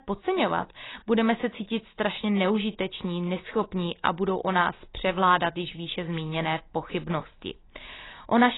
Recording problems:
garbled, watery; badly; nothing above 4 kHz
abrupt cut into speech; at the end

